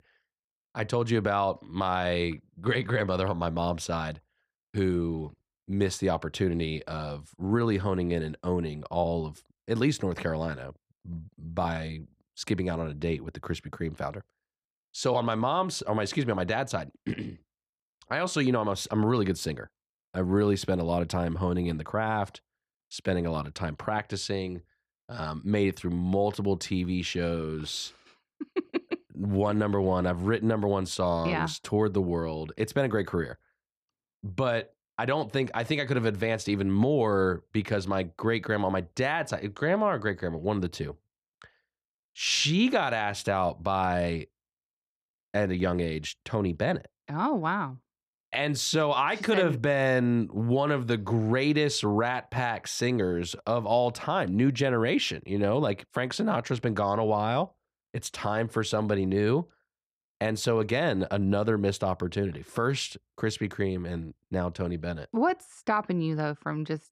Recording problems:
none

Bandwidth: 14.5 kHz